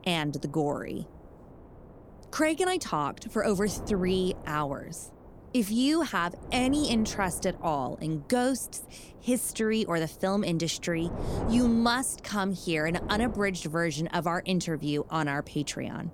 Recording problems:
wind noise on the microphone; occasional gusts; 15 dB below the speech

